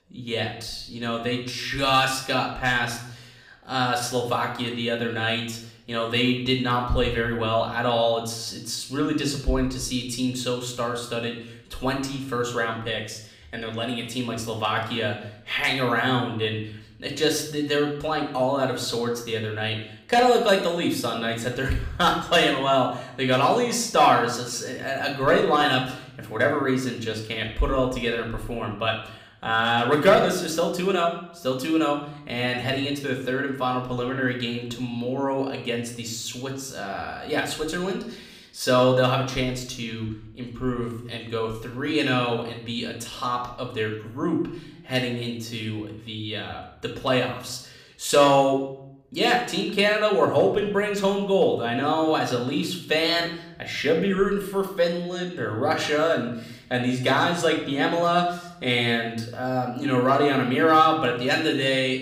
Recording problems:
room echo; slight; dies away in 0.6 s
off-mic speech; somewhat distant

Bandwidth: 15.5 kHz